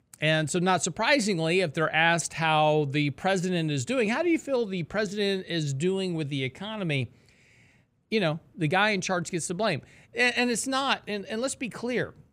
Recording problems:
none

